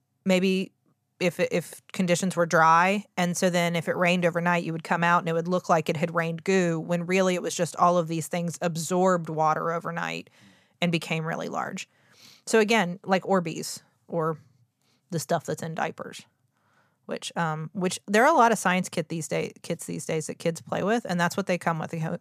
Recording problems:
none

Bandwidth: 14.5 kHz